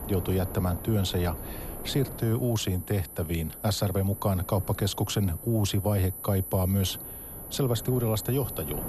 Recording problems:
high-pitched whine; noticeable; throughout; 12 kHz, 10 dB below the speech
wind noise on the microphone; occasional gusts; 15 dB below the speech

